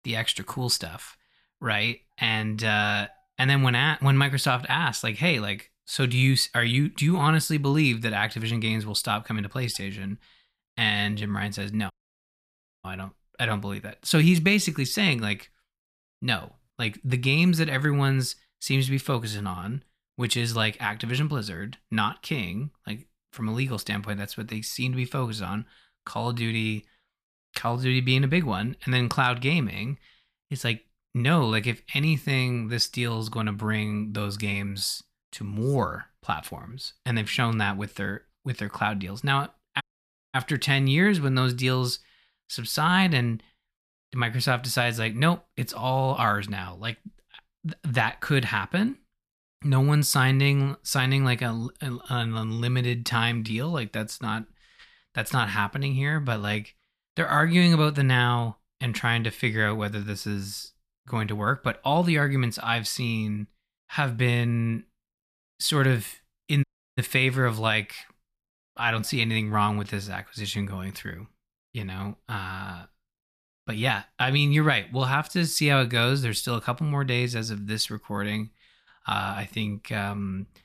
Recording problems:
audio cutting out; at 12 s for 1 s, at 40 s for 0.5 s and at 1:07

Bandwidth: 14.5 kHz